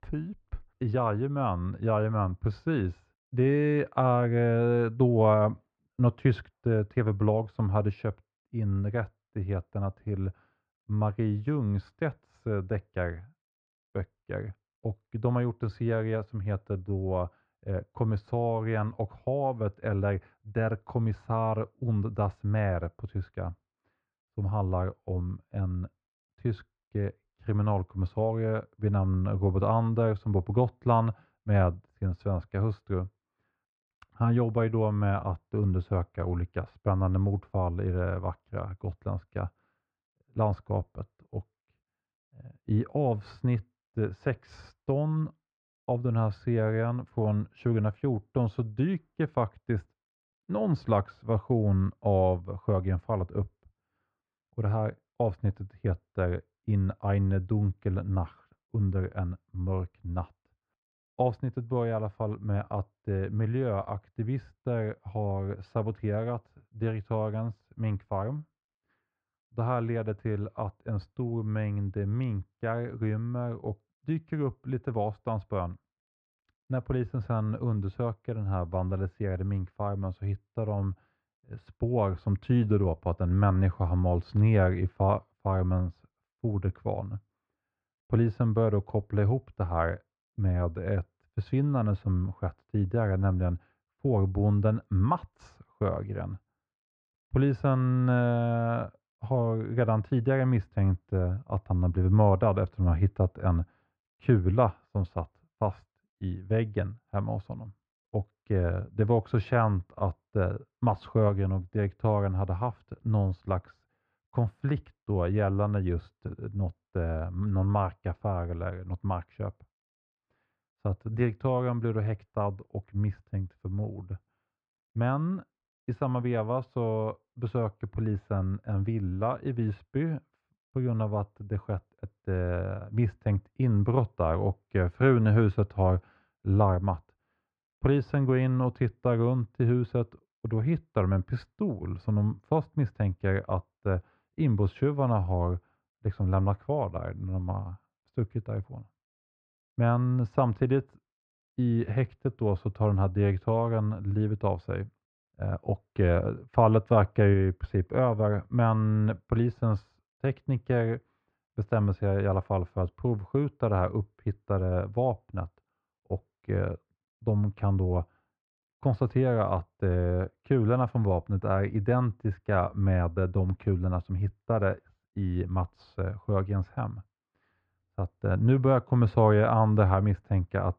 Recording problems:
muffled; very; fading above 1.5 kHz

